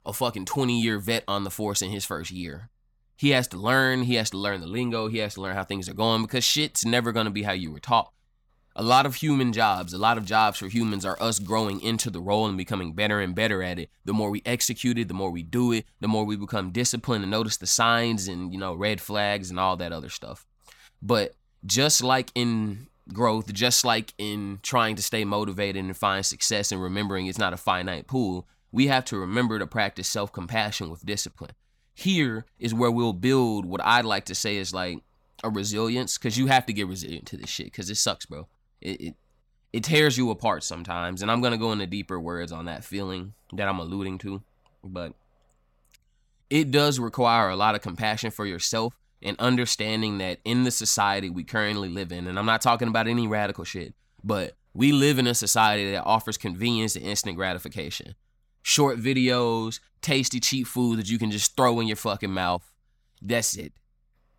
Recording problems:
crackling; faint; from 9.5 to 12 s; 25 dB below the speech

